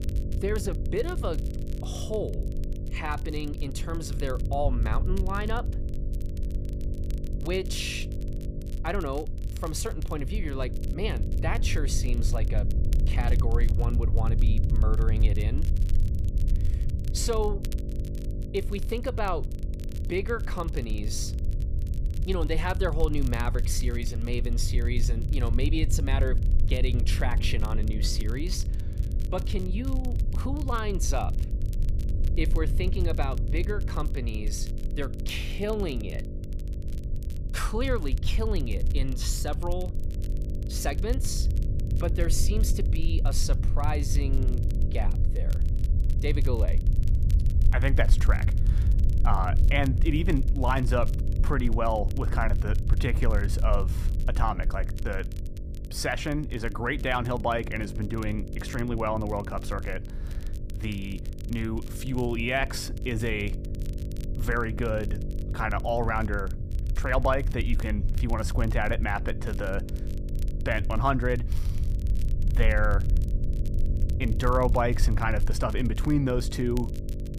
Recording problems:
electrical hum; noticeable; throughout; 50 Hz, 15 dB below the speech
low rumble; noticeable; throughout; 15 dB below the speech
crackle, like an old record; faint; 20 dB below the speech

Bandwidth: 15 kHz